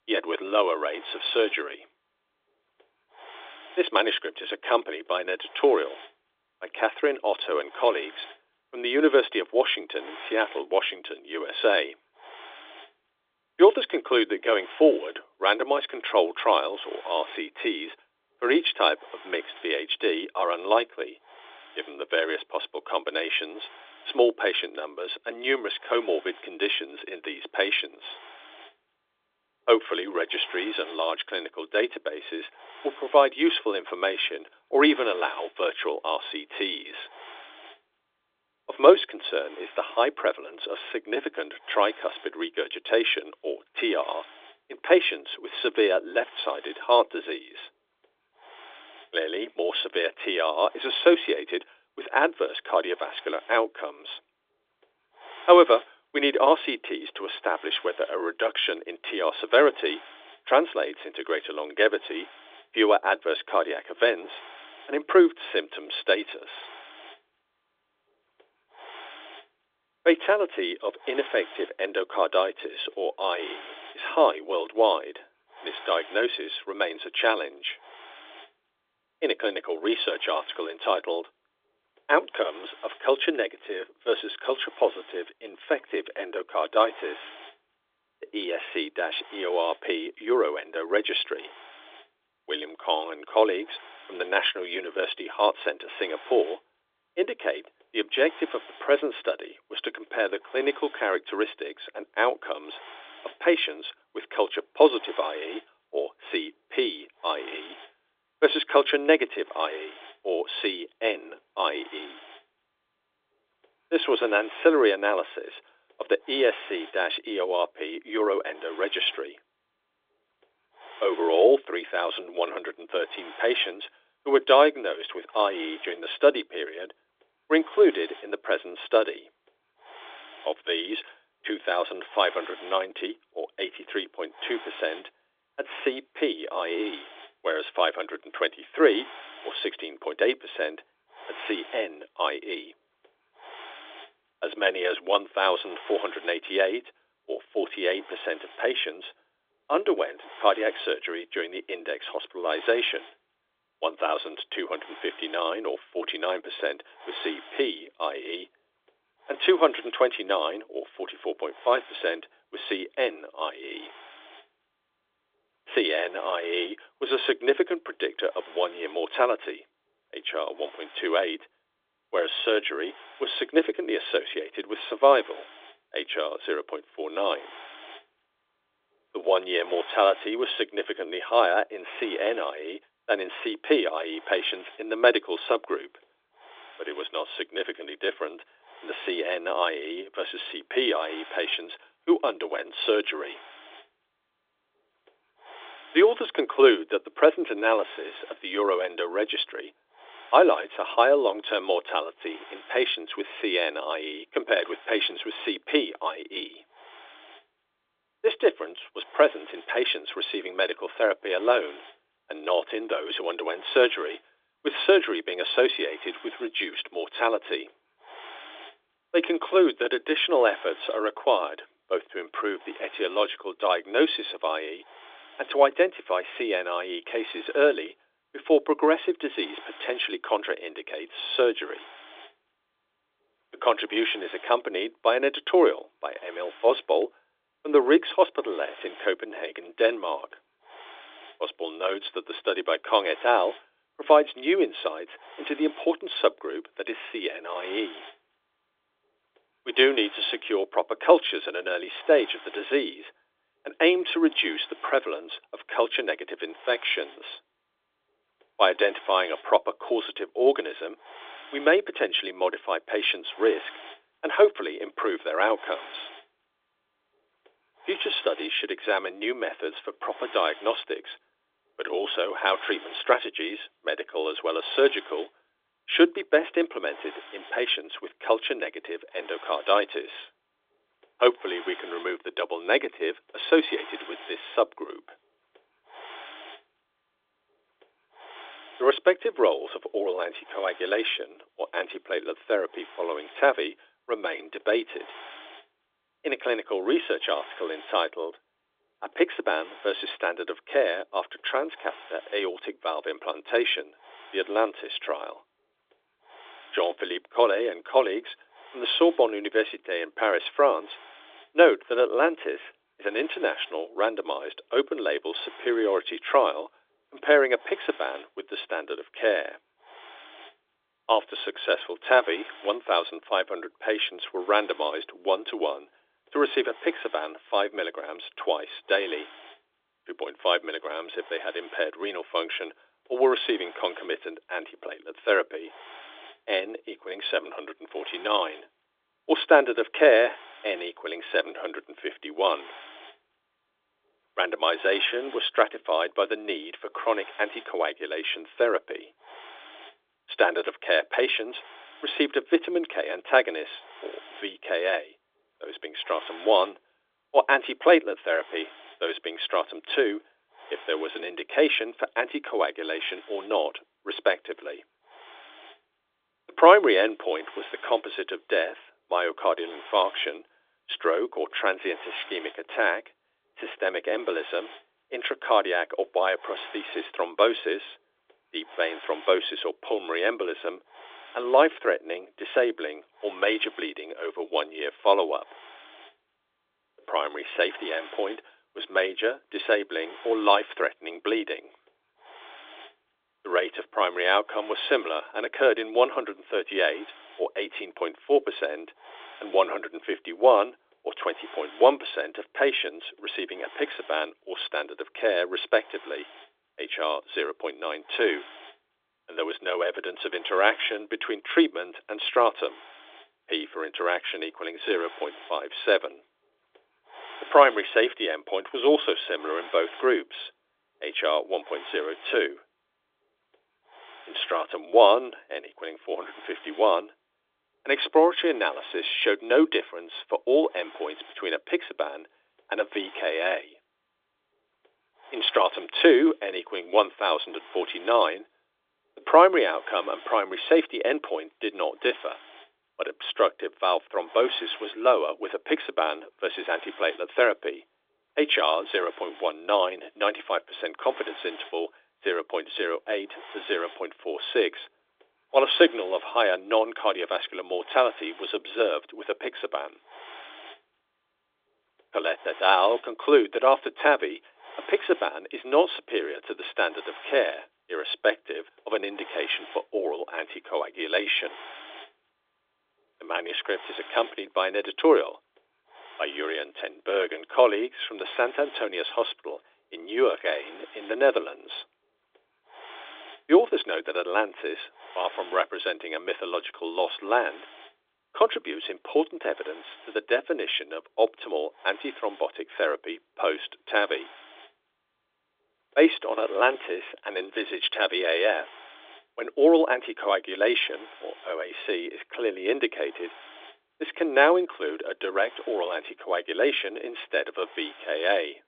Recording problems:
phone-call audio
hiss; faint; throughout; 20 dB below the speech

